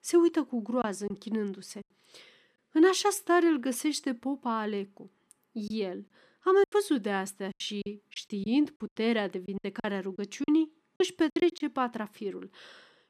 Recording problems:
choppy; very; 7% of the speech affected

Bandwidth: 14.5 kHz